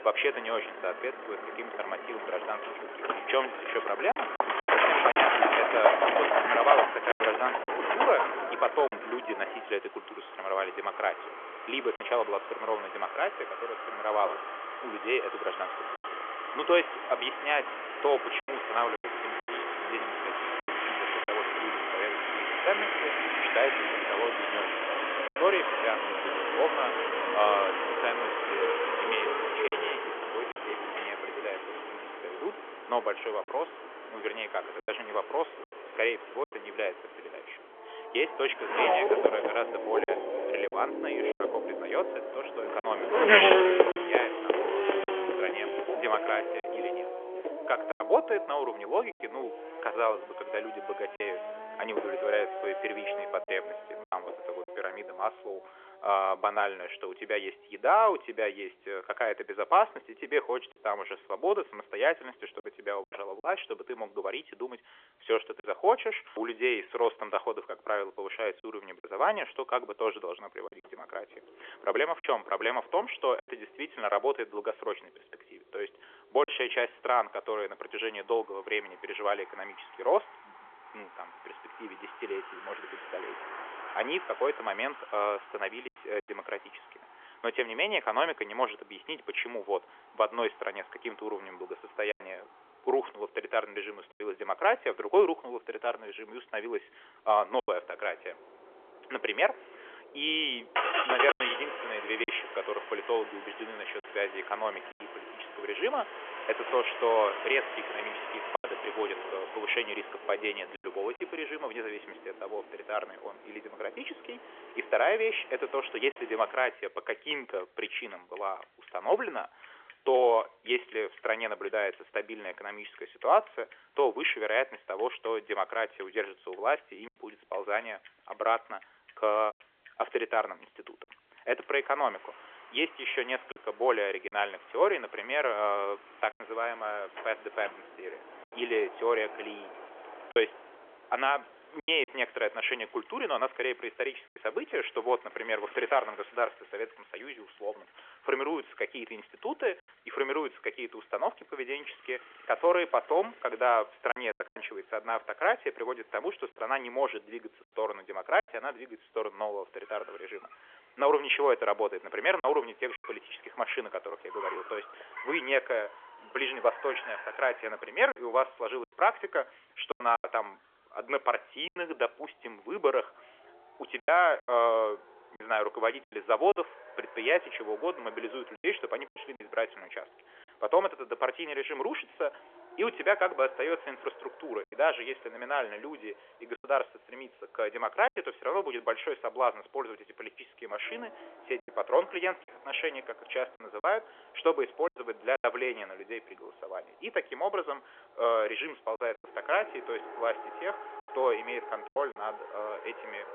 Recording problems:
phone-call audio; nothing above 3.5 kHz
traffic noise; loud; throughout; as loud as the speech
choppy; occasionally; 3% of the speech affected
door banging; faint; from 2:17 to 2:21; peak 15 dB below the speech

